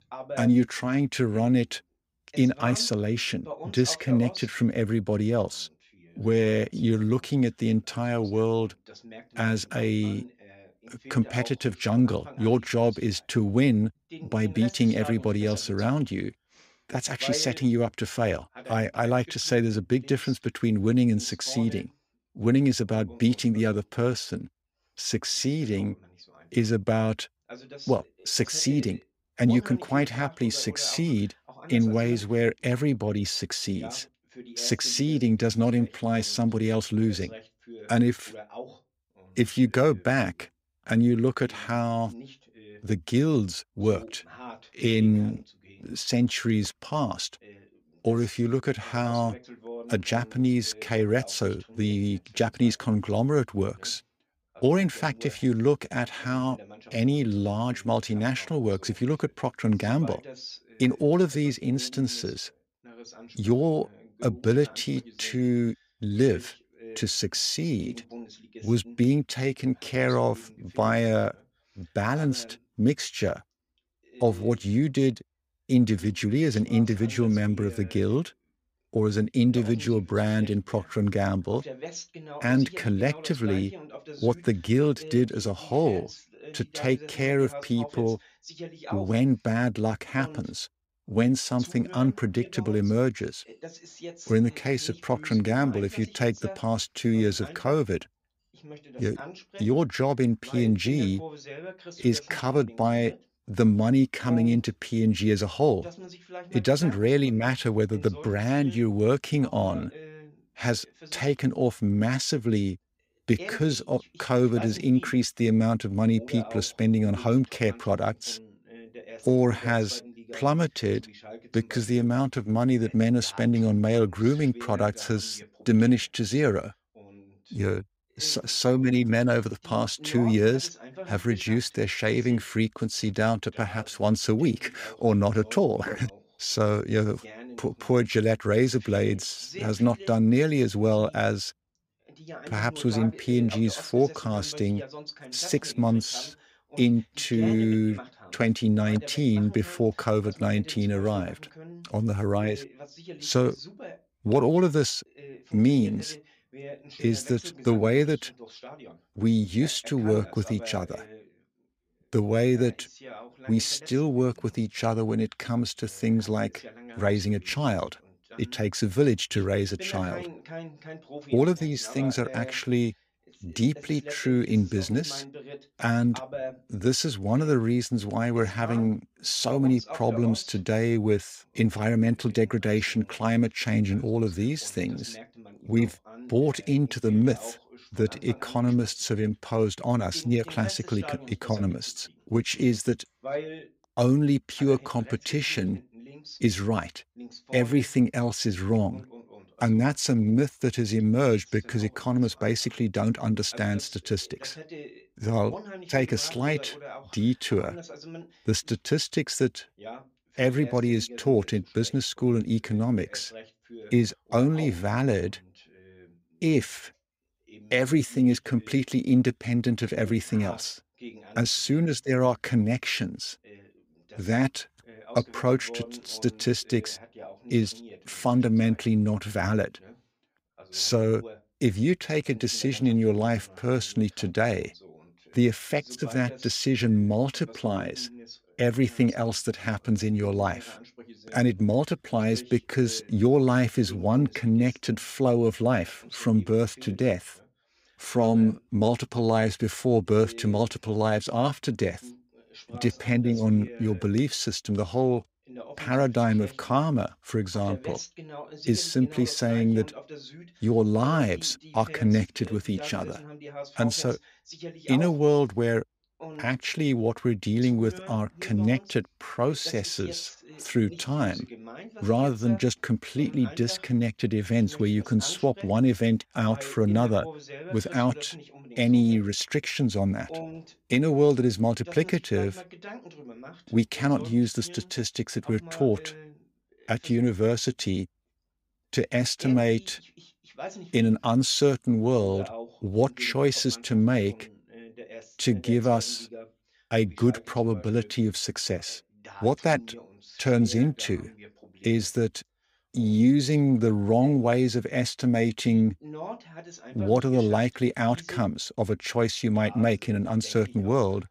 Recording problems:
voice in the background; noticeable; throughout; 20 dB below the speech

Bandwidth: 15.5 kHz